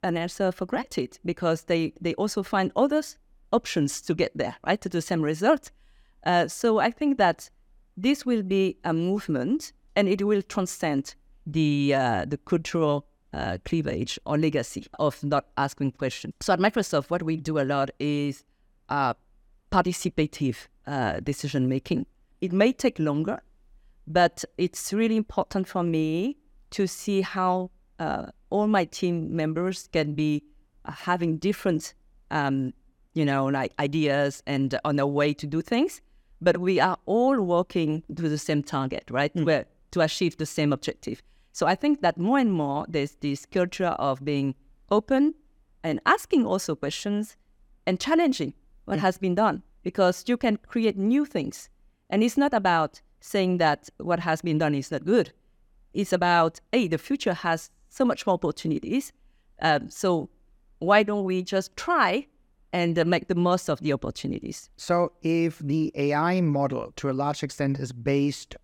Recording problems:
none

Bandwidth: 18 kHz